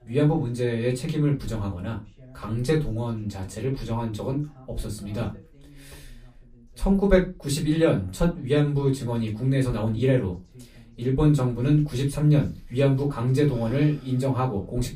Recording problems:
off-mic speech; far
room echo; very slight; dies away in 0.2 s
voice in the background; faint; throughout; 30 dB below the speech

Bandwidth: 15 kHz